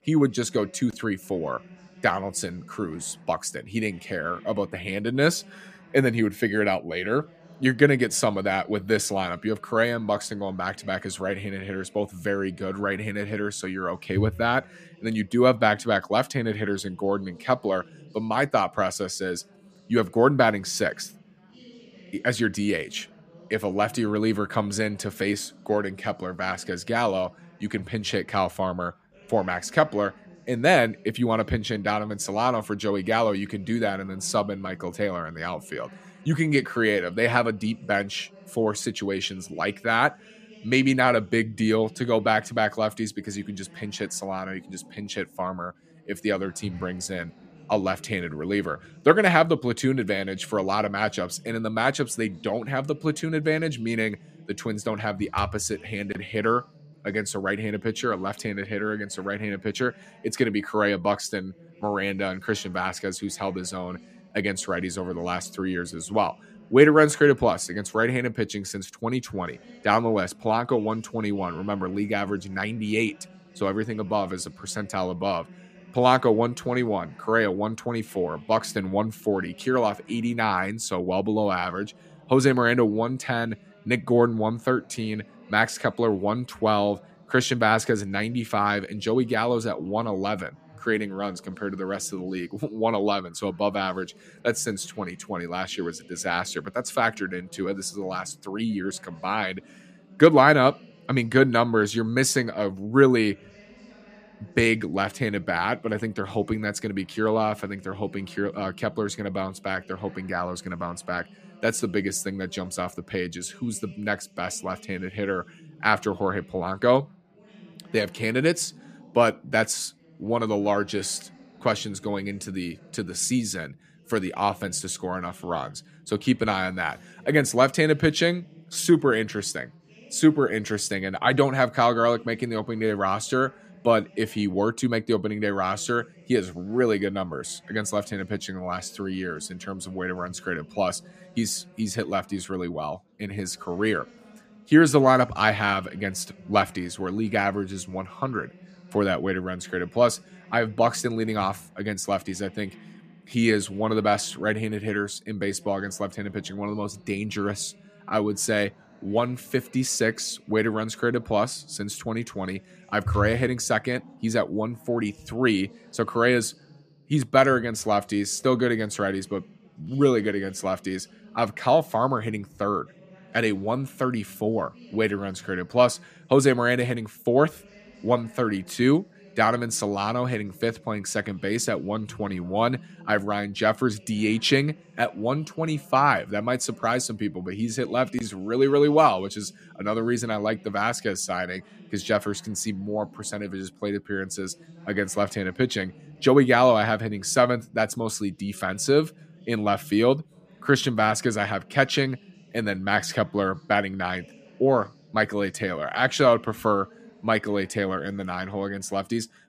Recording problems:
background chatter; faint; throughout; 3 voices, 25 dB below the speech

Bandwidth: 14.5 kHz